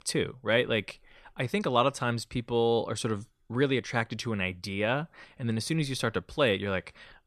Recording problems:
none

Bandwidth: 14 kHz